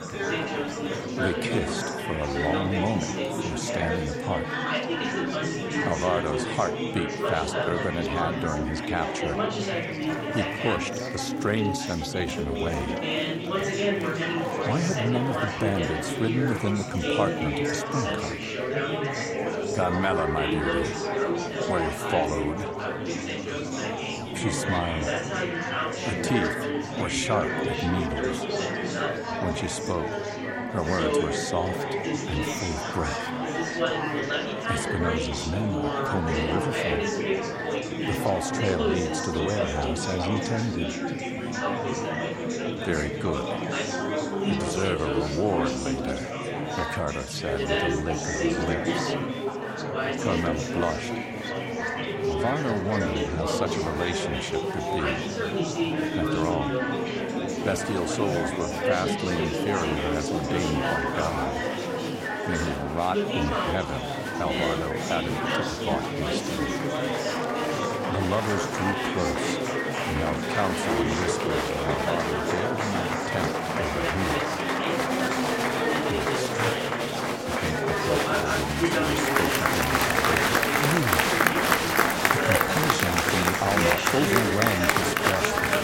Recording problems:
chatter from many people; very loud; throughout; 3 dB above the speech

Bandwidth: 16.5 kHz